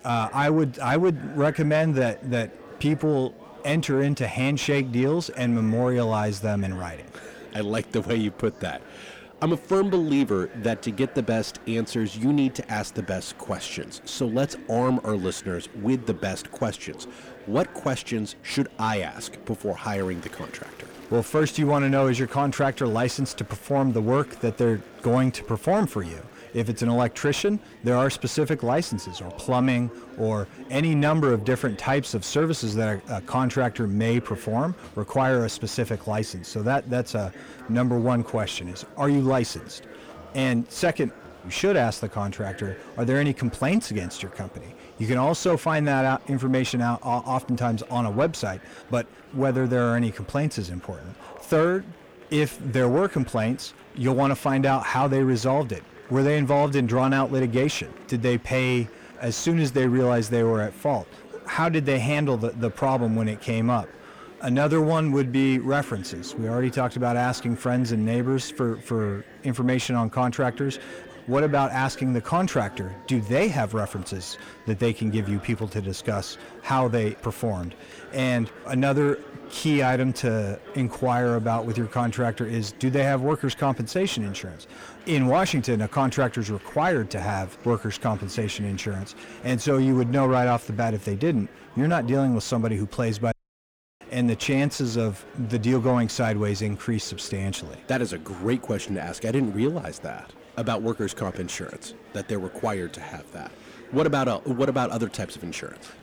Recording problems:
distortion; slight; 10 dB below the speech
murmuring crowd; faint; throughout; 20 dB below the speech
audio cutting out; at 1:33 for 0.5 s

